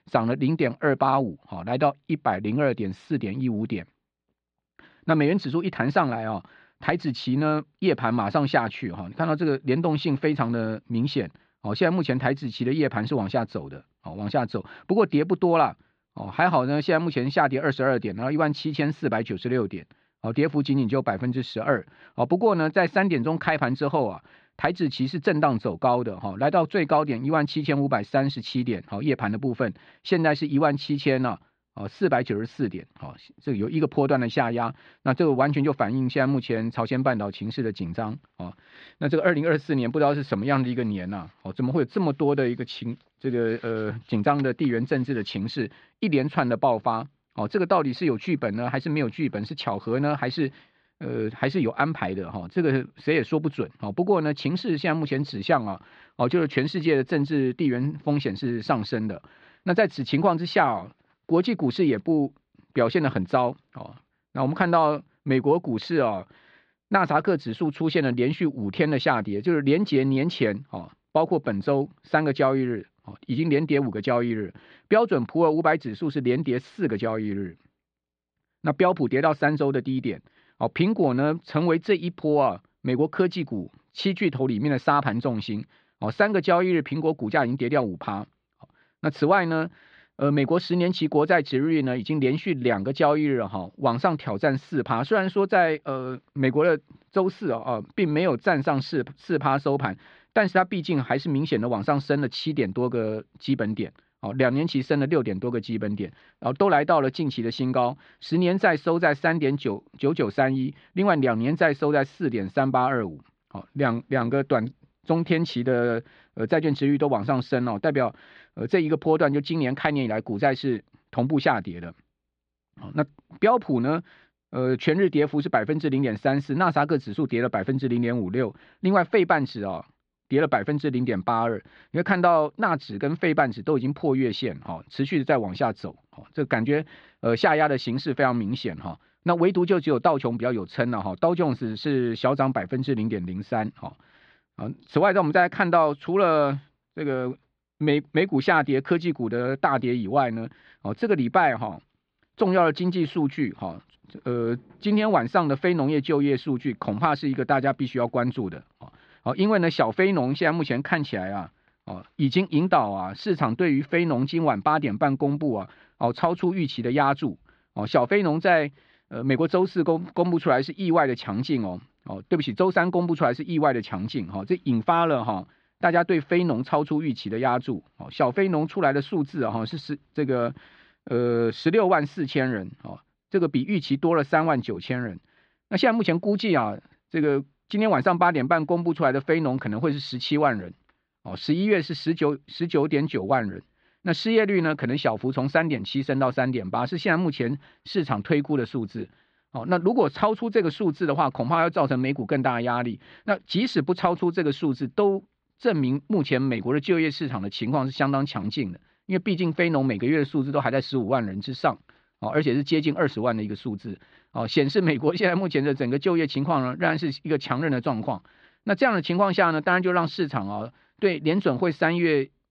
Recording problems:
muffled; very slightly; fading above 4 kHz

